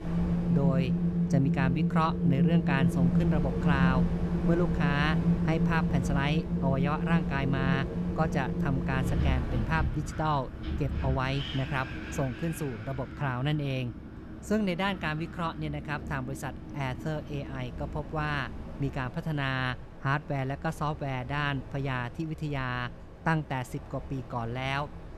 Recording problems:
wind in the background; very loud; throughout; 1 dB above the speech

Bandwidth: 13.5 kHz